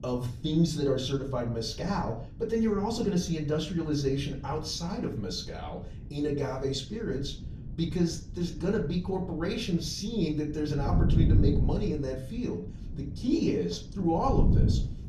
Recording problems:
off-mic speech; far
room echo; slight; dies away in 0.4 s
wind noise on the microphone; occasional gusts; 10 dB below the speech

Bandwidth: 14 kHz